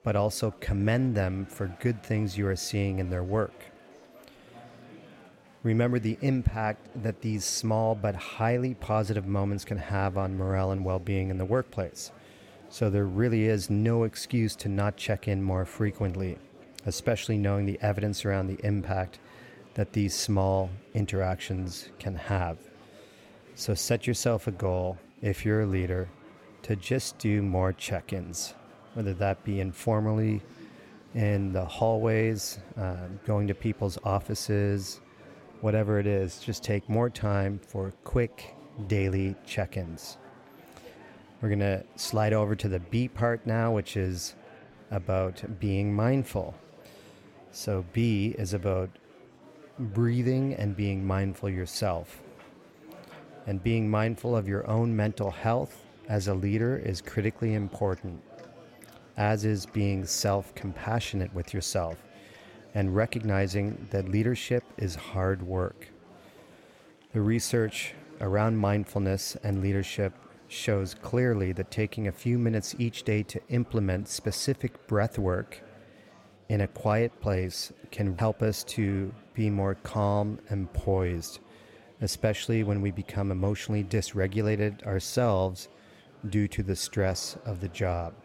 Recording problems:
murmuring crowd; faint; throughout; 25 dB below the speech

